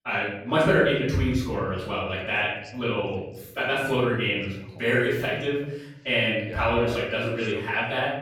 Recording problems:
off-mic speech; far
room echo; noticeable; dies away in 0.8 s
voice in the background; faint; throughout; 20 dB below the speech

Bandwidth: 17 kHz